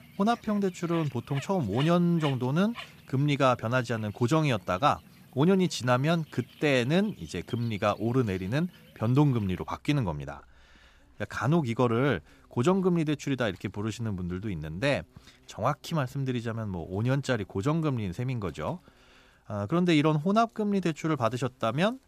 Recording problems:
animal sounds; faint; throughout; 20 dB below the speech

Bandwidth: 14.5 kHz